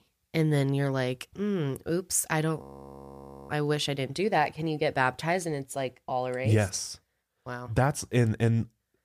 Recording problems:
audio freezing; at 2.5 s for 1 s

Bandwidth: 15 kHz